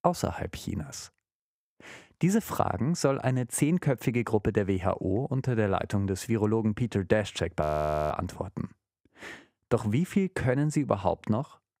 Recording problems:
audio freezing; at 7.5 s

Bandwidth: 15.5 kHz